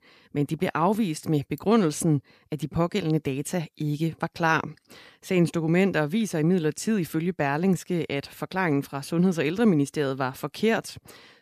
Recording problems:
none

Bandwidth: 14.5 kHz